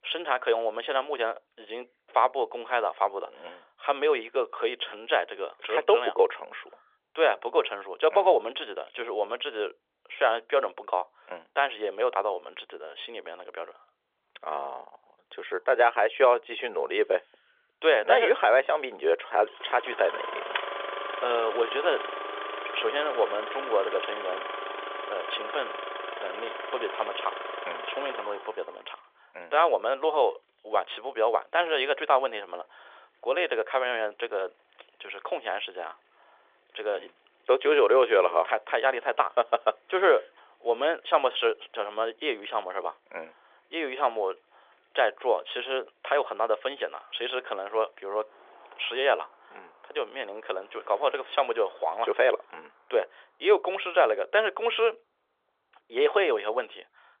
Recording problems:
phone-call audio; nothing above 3.5 kHz
traffic noise; loud; from 14 s on; 8 dB below the speech

